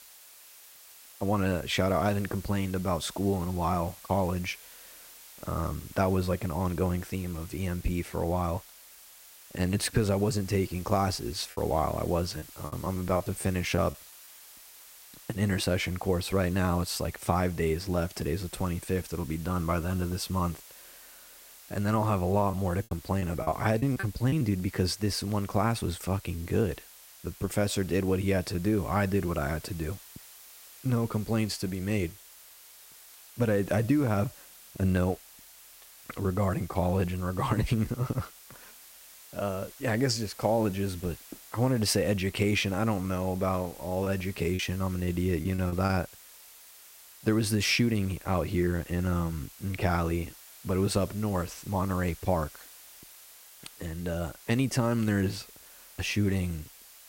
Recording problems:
hiss; noticeable; throughout; 20 dB below the speech
choppy; very; from 12 to 14 s, from 22 to 24 s and from 44 to 46 s; 12% of the speech affected

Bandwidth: 16 kHz